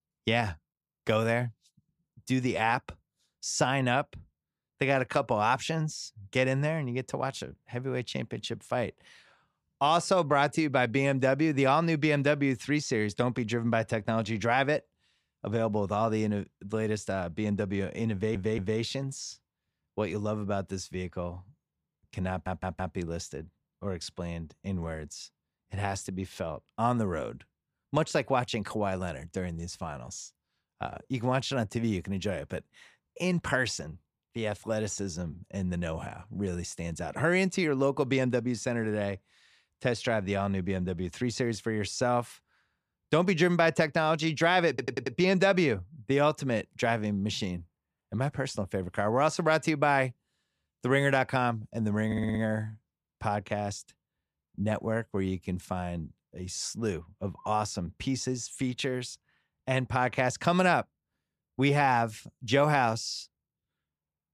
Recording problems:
audio stuttering; 4 times, first at 18 s

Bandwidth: 14.5 kHz